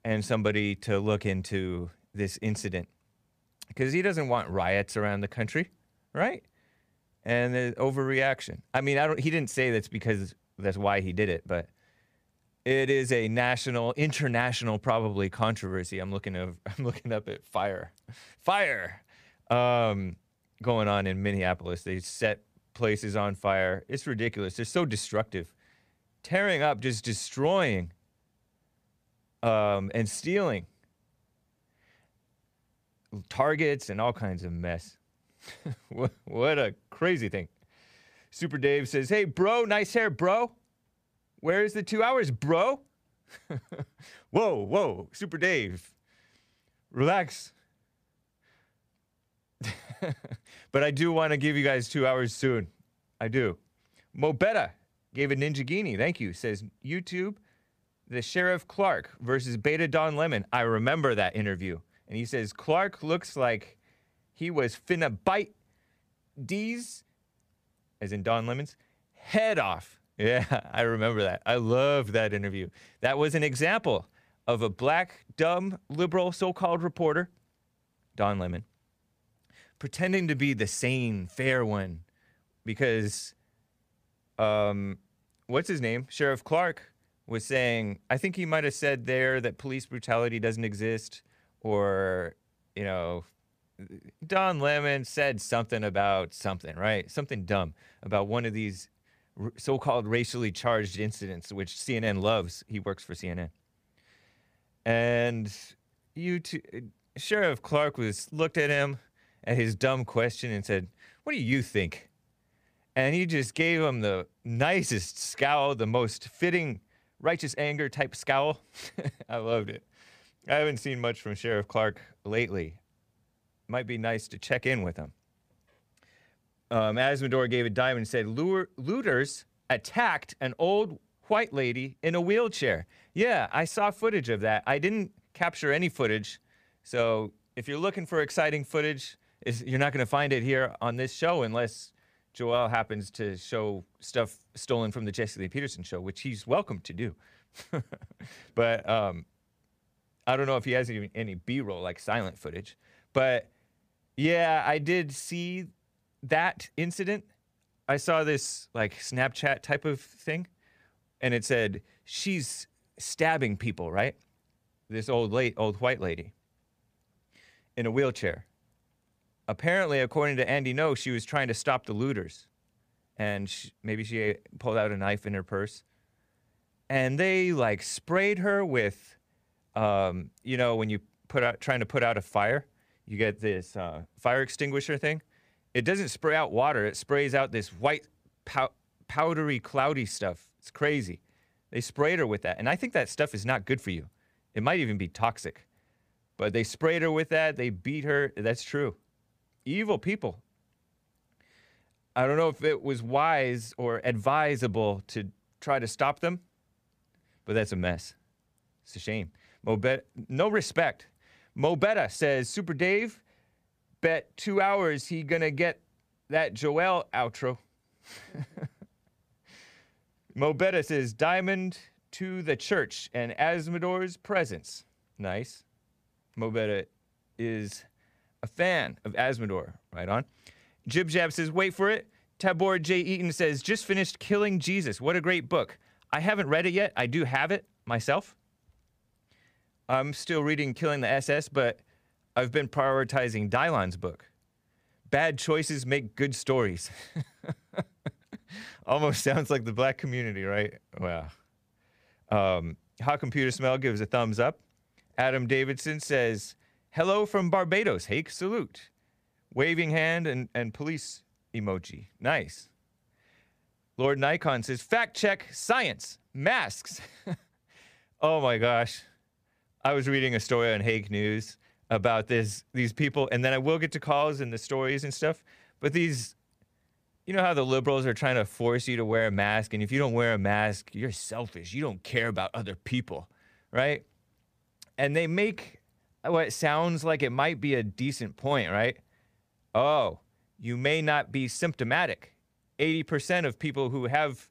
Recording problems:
none

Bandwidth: 15 kHz